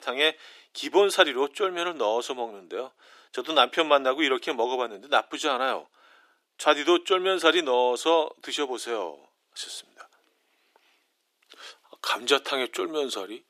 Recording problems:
thin; very; fading below 350 Hz

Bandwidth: 14.5 kHz